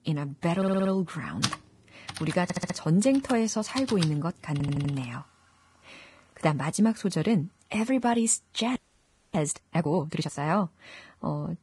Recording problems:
garbled, watery; badly
household noises; loud; throughout; 10 dB below the speech
audio stuttering; at 0.5 s, at 2.5 s and at 4.5 s
audio freezing; at 9 s for 0.5 s

